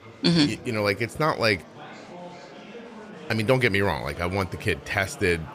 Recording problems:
murmuring crowd; noticeable; throughout; 20 dB below the speech

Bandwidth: 15 kHz